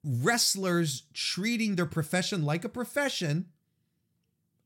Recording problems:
none

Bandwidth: 16.5 kHz